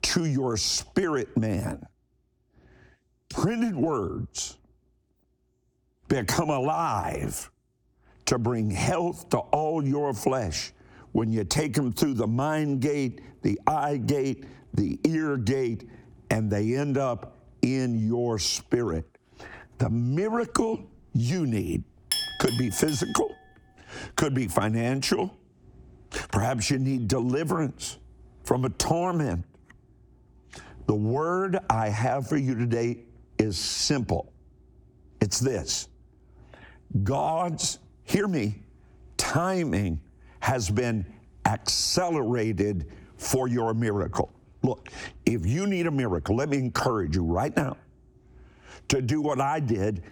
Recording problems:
squashed, flat; heavily
clattering dishes; noticeable; at 22 s; peak level with the speech

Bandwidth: 19 kHz